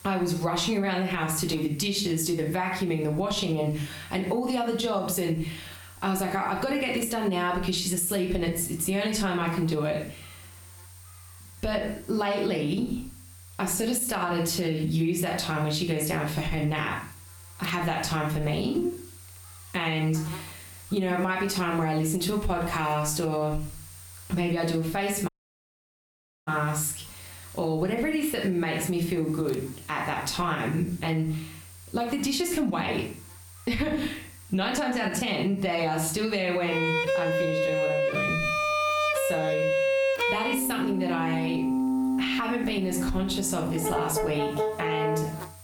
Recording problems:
room echo; slight; dies away in 0.4 s
off-mic speech; somewhat distant
squashed, flat; somewhat, background pumping
background music; very loud; from 37 s on; 1 dB above the speech
electrical hum; faint; throughout; 60 Hz, 25 dB below the speech
audio cutting out; at 25 s for 1 s

